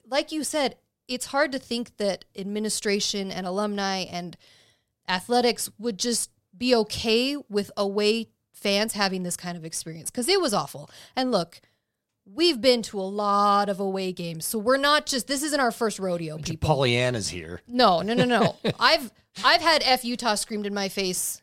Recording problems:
none

